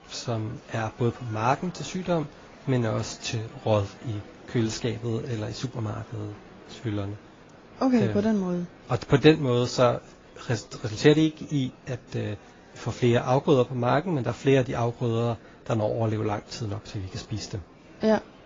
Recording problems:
garbled, watery; slightly
murmuring crowd; faint; throughout; 25 dB below the speech

